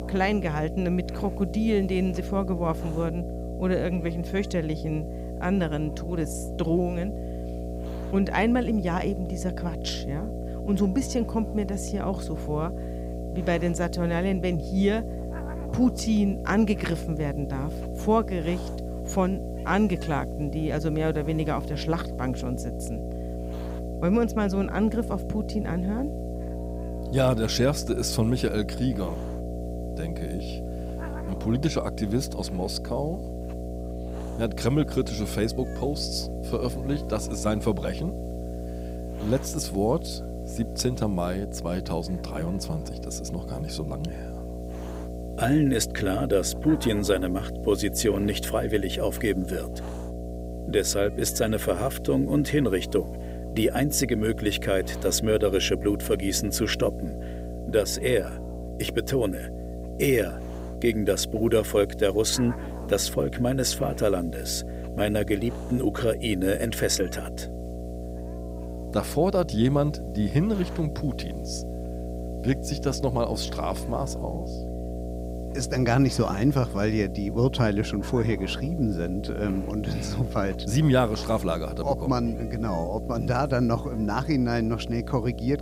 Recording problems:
electrical hum; noticeable; throughout; 60 Hz, 10 dB below the speech
hiss; faint; throughout; 25 dB below the speech

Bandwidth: 15.5 kHz